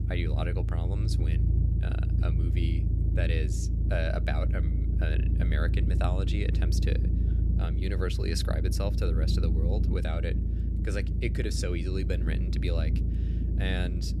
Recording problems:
low rumble; loud; throughout; 5 dB below the speech

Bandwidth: 14.5 kHz